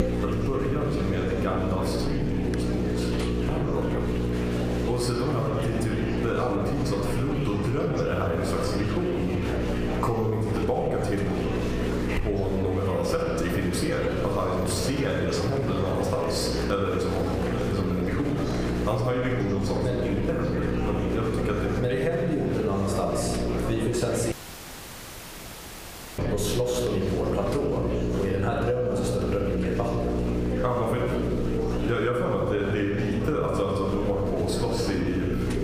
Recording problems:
room echo; noticeable; dies away in 1 s
off-mic speech; somewhat distant
squashed, flat; somewhat
electrical hum; loud; throughout; 60 Hz, 7 dB below the speech
murmuring crowd; loud; throughout; 8 dB below the speech
audio cutting out; filled with static; at 24 s for 2 s

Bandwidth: 15 kHz